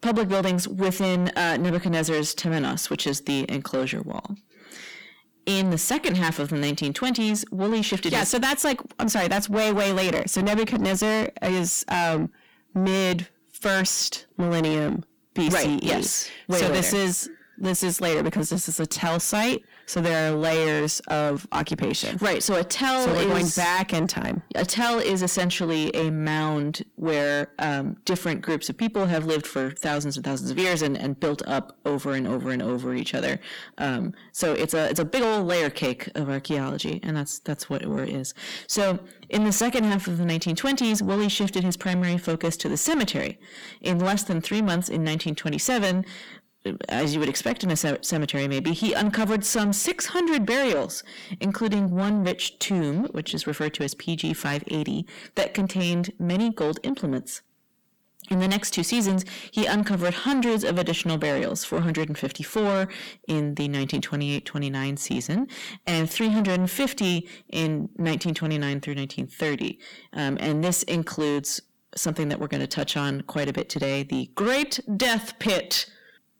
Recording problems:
distortion; heavy; 6 dB below the speech

